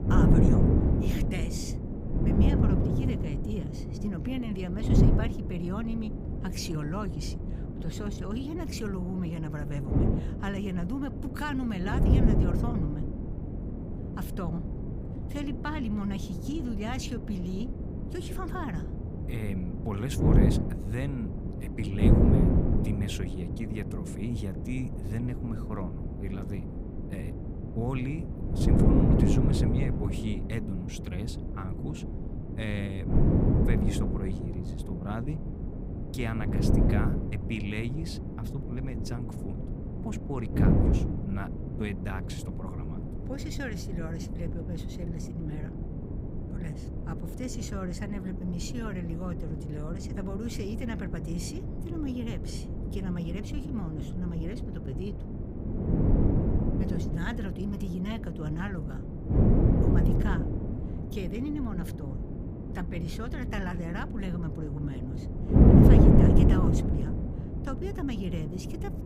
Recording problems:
wind noise on the microphone; heavy; 3 dB above the speech

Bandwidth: 15.5 kHz